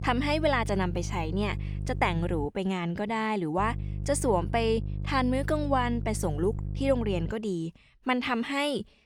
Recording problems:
electrical hum; noticeable; until 2.5 s and from 3.5 to 7.5 s; 50 Hz, 20 dB below the speech

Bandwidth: 18.5 kHz